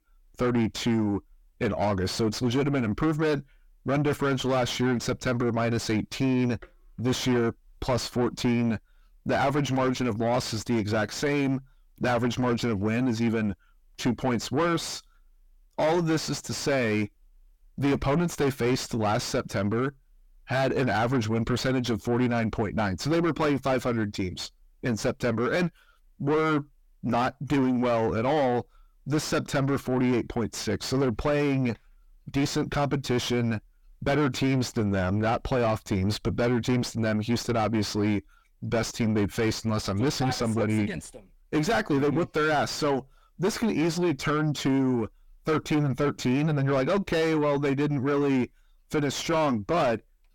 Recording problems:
distortion; heavy; 5 dB below the speech

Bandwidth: 17.5 kHz